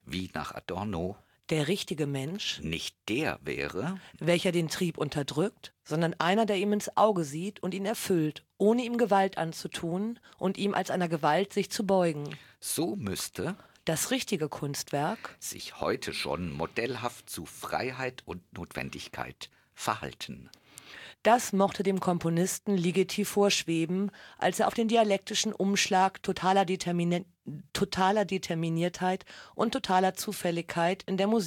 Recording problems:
abrupt cut into speech; at the end

